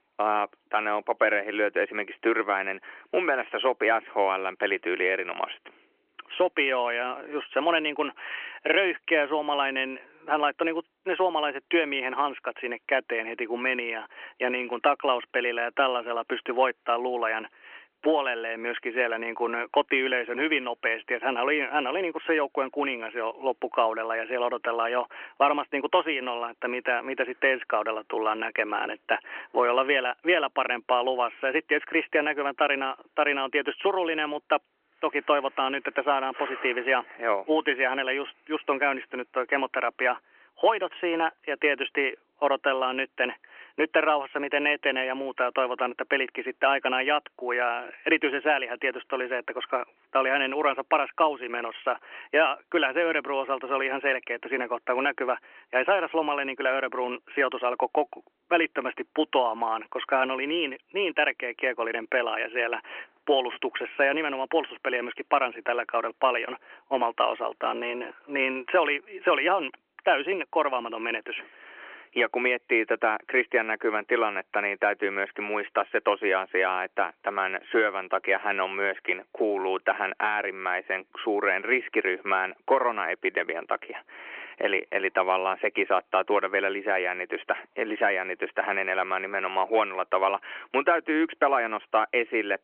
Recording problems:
phone-call audio; nothing above 3 kHz

